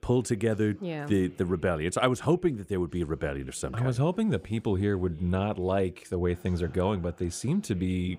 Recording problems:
background chatter; faint; throughout; 4 voices, 30 dB below the speech

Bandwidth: 15.5 kHz